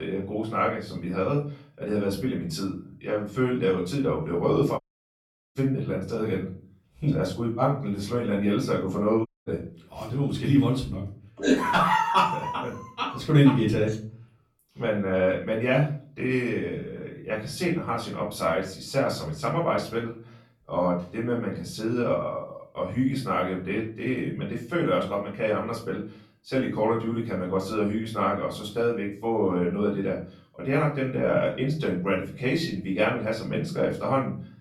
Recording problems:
off-mic speech; far
room echo; slight; dies away in 0.4 s
abrupt cut into speech; at the start
audio cutting out; at 5 s for 1 s and at 9.5 s

